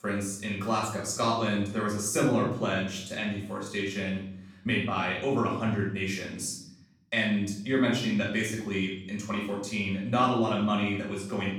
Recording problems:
off-mic speech; far
room echo; noticeable; dies away in 0.8 s

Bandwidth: 18 kHz